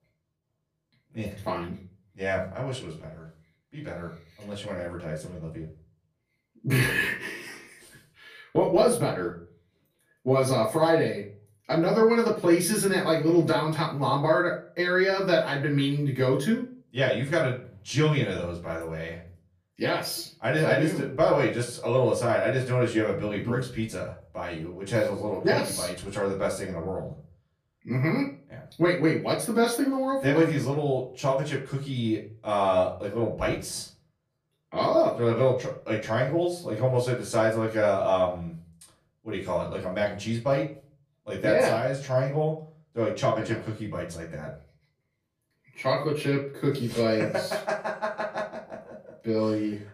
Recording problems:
off-mic speech; far
room echo; slight; dies away in 0.4 s

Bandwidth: 15 kHz